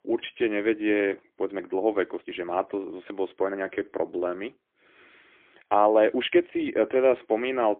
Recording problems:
phone-call audio; poor line; nothing above 3.5 kHz
uneven, jittery; strongly; from 1.5 to 7 s

